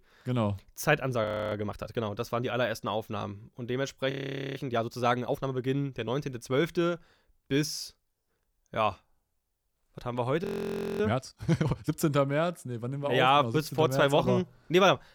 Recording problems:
audio freezing; at 1 s, at 4 s and at 10 s for 0.5 s

